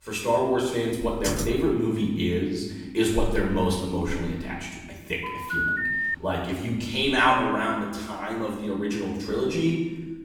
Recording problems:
off-mic speech; far
room echo; noticeable; dies away in 1 s
keyboard typing; noticeable; at 1 s; peak 4 dB below the speech
phone ringing; loud; at 5 s; peak 2 dB above the speech

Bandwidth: 18.5 kHz